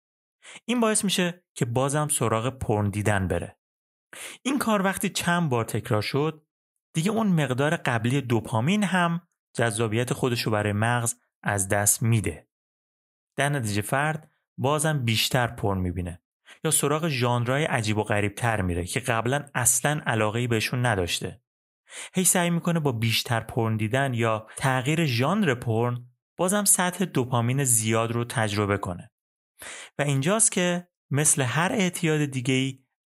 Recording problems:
none

